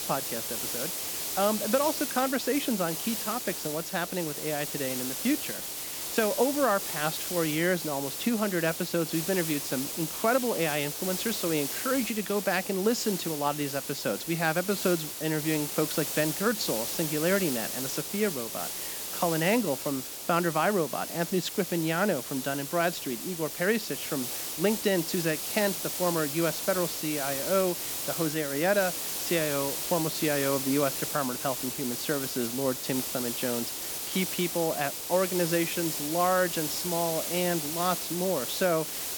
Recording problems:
high frequencies cut off; slight; nothing above 8 kHz
hiss; loud; throughout; 3 dB below the speech

